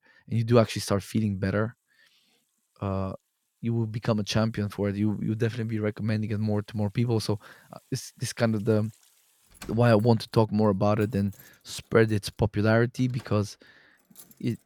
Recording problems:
household noises; faint; throughout; 30 dB below the speech

